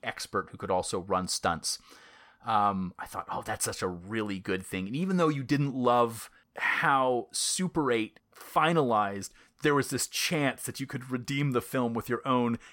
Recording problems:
none

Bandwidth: 17.5 kHz